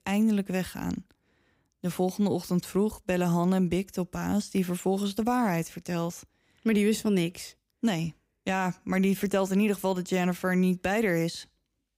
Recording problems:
none

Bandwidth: 15.5 kHz